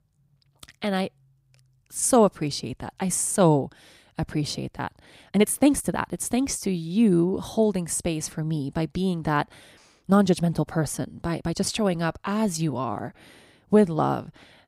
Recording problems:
uneven, jittery; strongly; from 5 to 12 s

